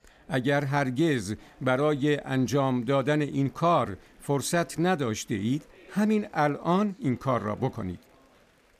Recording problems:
chatter from many people; faint; throughout; 30 dB below the speech

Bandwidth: 14.5 kHz